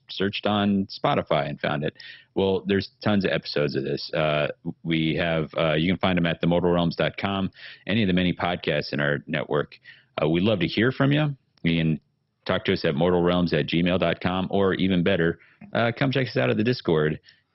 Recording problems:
garbled, watery; badly; nothing above 5.5 kHz

